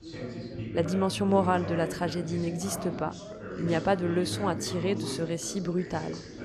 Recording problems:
background chatter; loud; throughout; 4 voices, 7 dB below the speech

